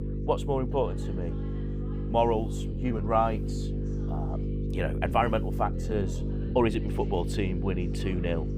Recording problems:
electrical hum; noticeable; throughout; 50 Hz, 10 dB below the speech
background chatter; faint; throughout; 3 voices, 20 dB below the speech
uneven, jittery; slightly; from 2.5 to 7 s

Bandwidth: 15.5 kHz